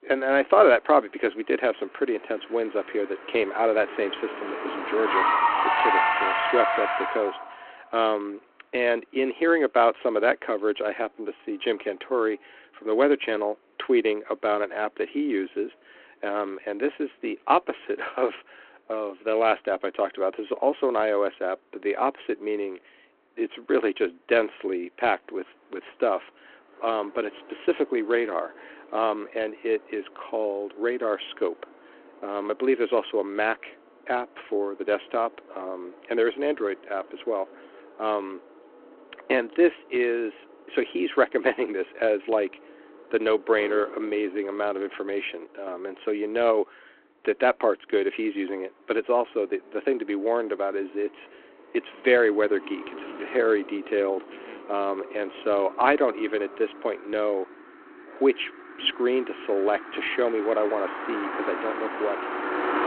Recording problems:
phone-call audio
traffic noise; loud; throughout; 3 dB below the speech

